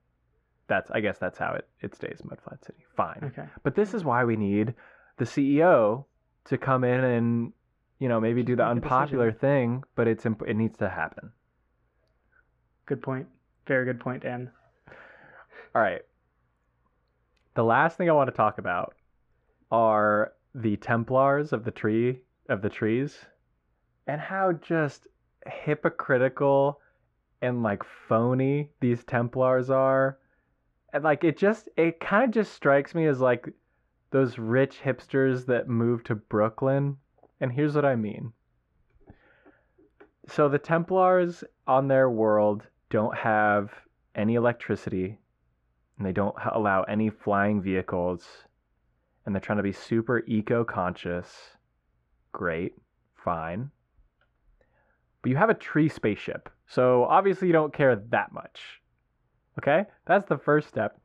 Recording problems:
muffled; very; fading above 1.5 kHz

